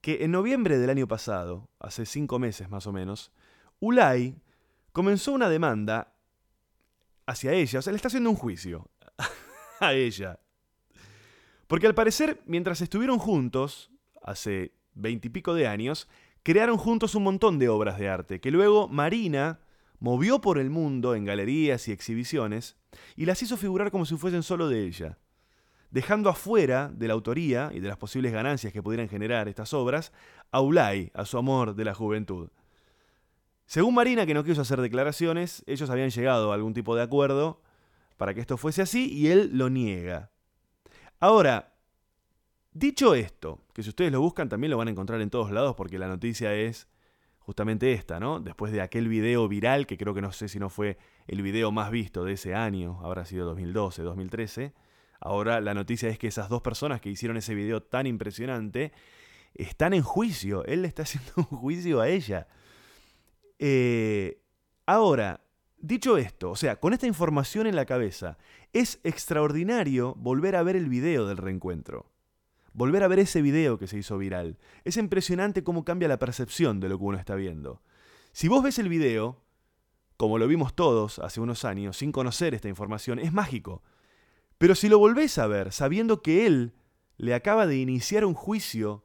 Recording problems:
none

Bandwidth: 18 kHz